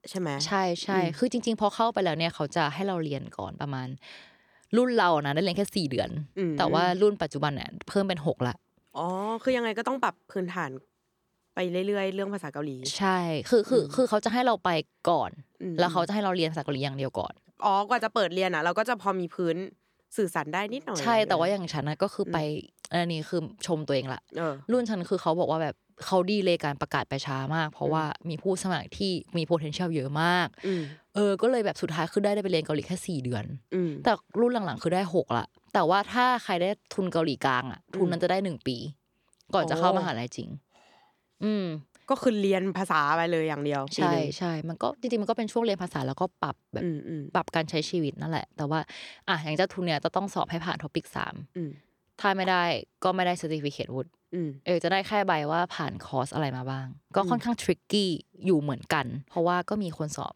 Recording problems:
none

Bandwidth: 18.5 kHz